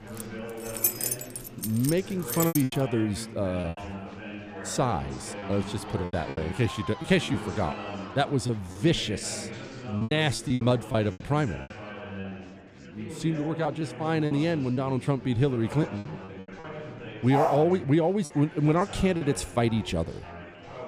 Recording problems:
chatter from many people; noticeable; throughout; 10 dB below the speech
choppy; very; 9% of the speech affected
jangling keys; loud; until 2.5 s; peak 2 dB above the speech
dog barking; loud; at 17 s; peak level with the speech

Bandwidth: 15 kHz